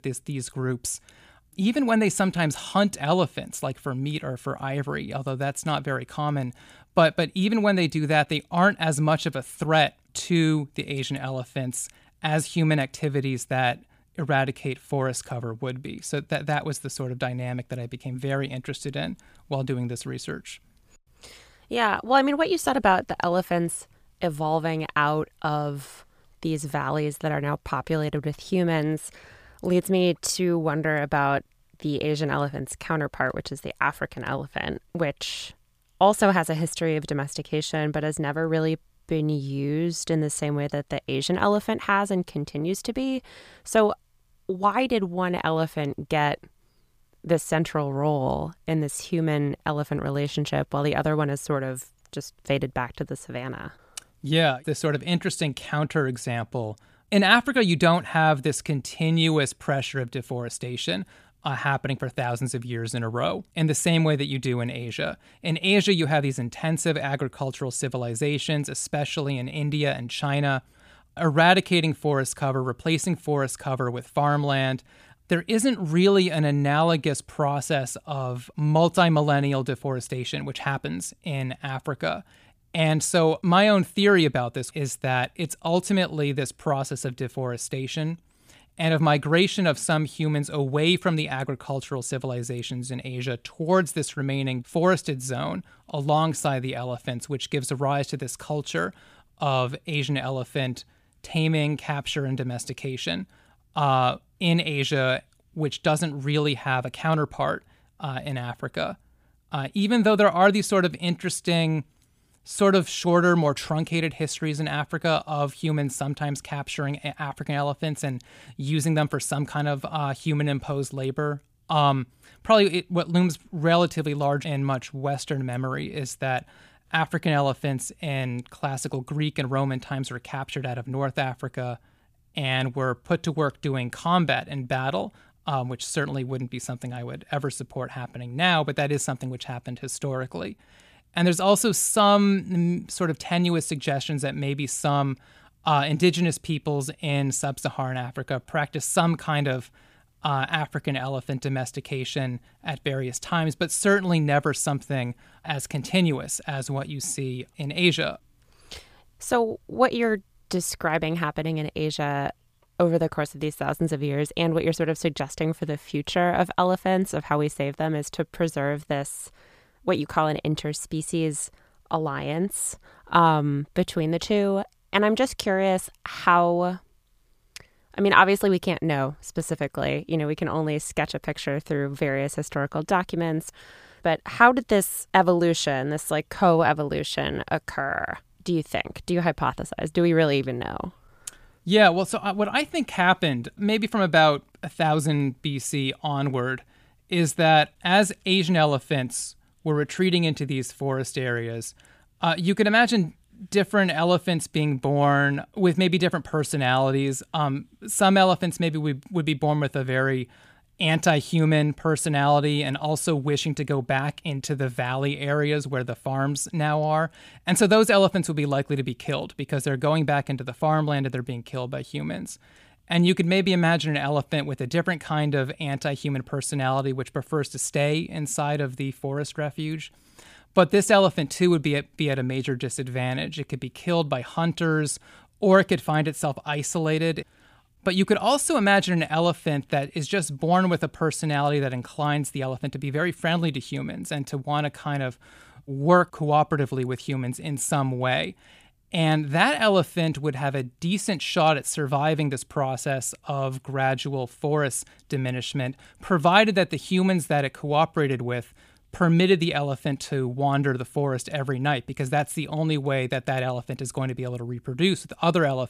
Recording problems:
none

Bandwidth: 15 kHz